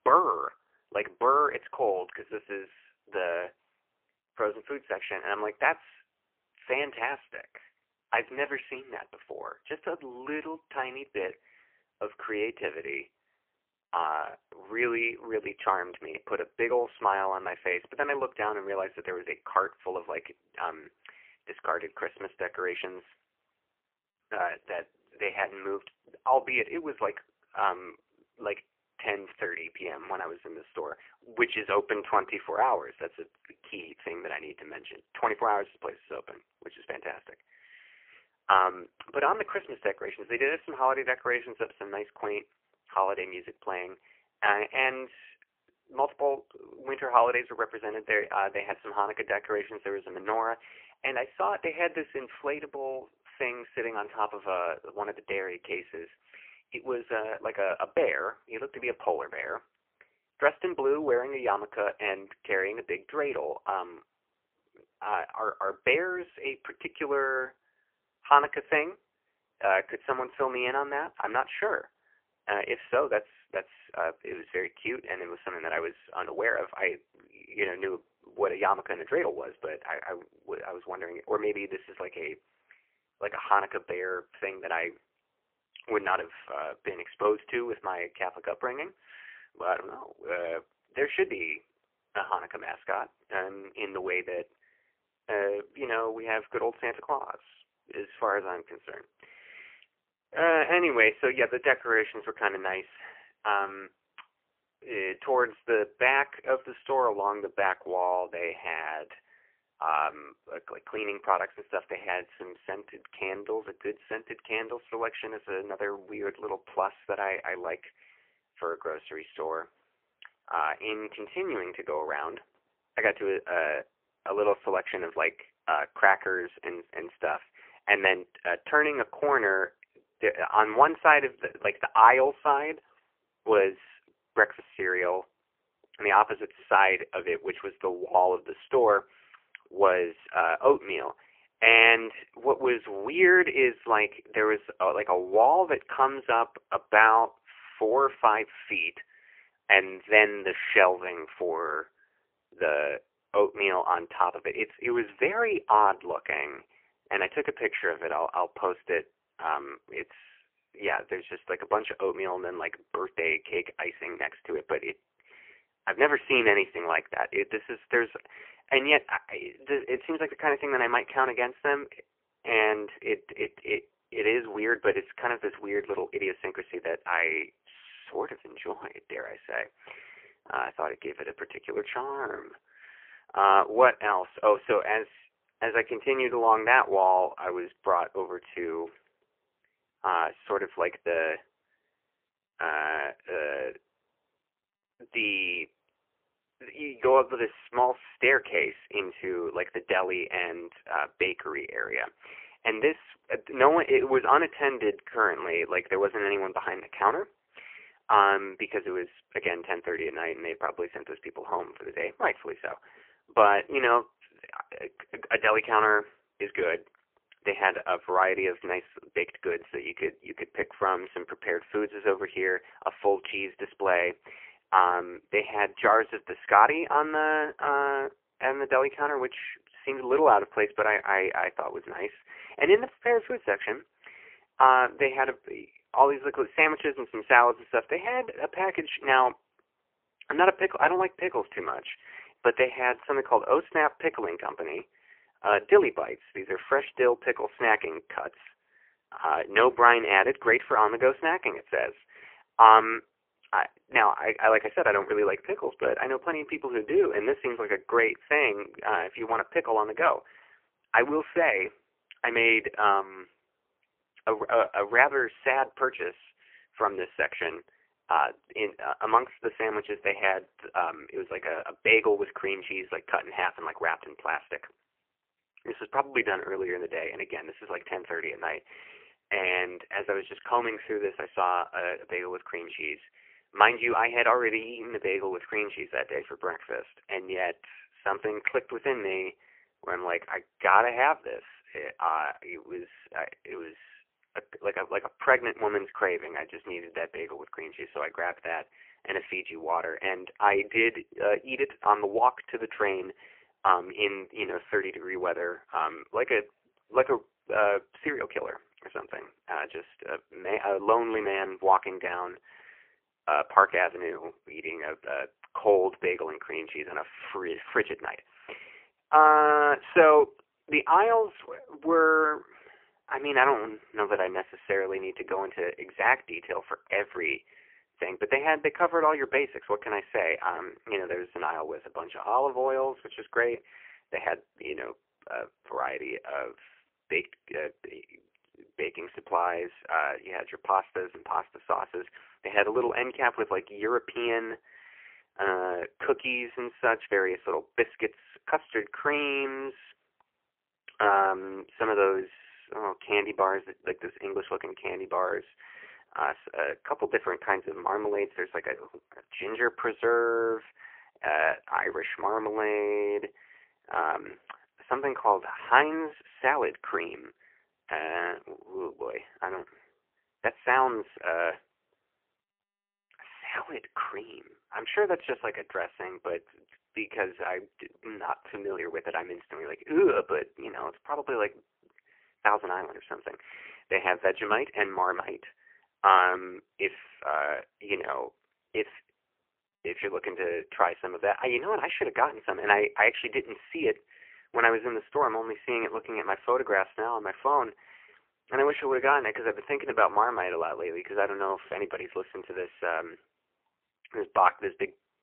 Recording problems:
phone-call audio; poor line; nothing above 3 kHz

